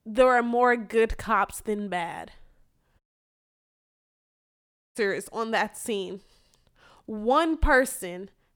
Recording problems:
audio cutting out; at 3 s for 2 s

